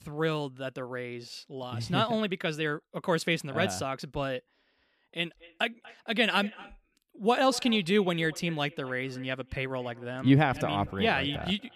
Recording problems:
echo of what is said; faint; from 5.5 s on; 240 ms later, 20 dB below the speech

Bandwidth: 14.5 kHz